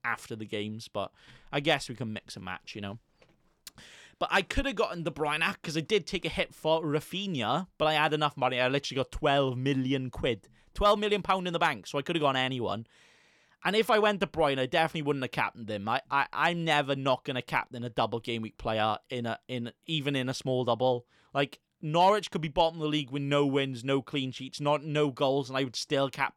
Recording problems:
none

